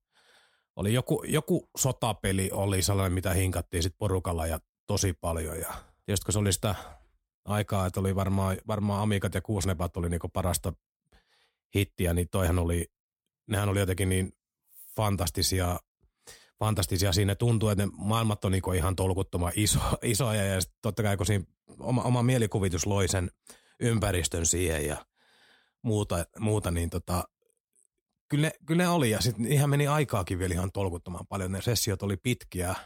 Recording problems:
none

